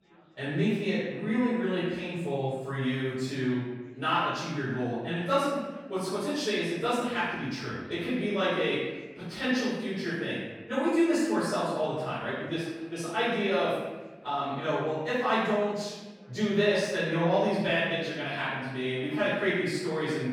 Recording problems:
room echo; strong; dies away in 1.1 s
off-mic speech; far
chatter from many people; faint; throughout; 30 dB below the speech

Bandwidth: 18 kHz